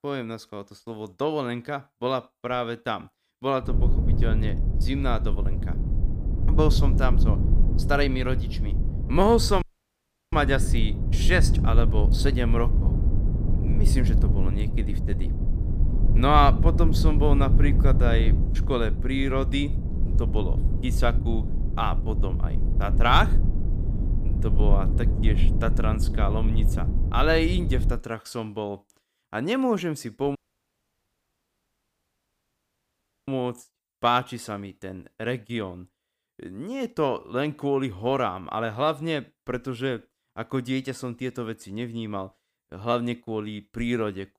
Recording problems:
low rumble; noticeable; from 3.5 to 28 s; 10 dB below the speech
audio cutting out; at 9.5 s for 0.5 s and at 30 s for 3 s

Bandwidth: 15 kHz